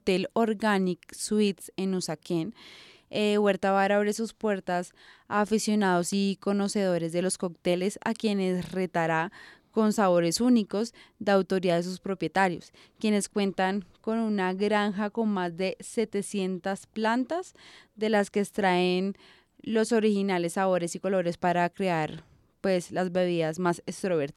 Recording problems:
none

